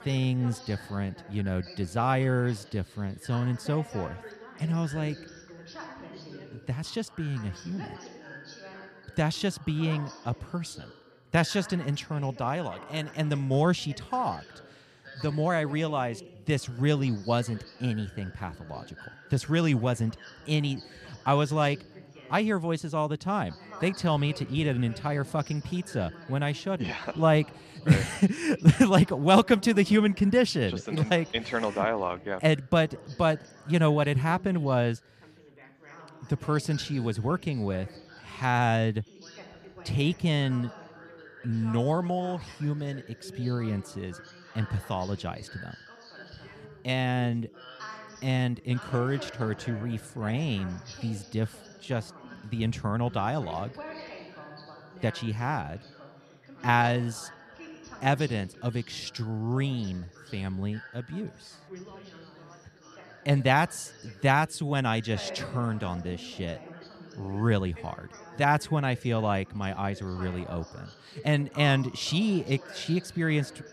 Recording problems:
background chatter; noticeable; throughout; 4 voices, 20 dB below the speech

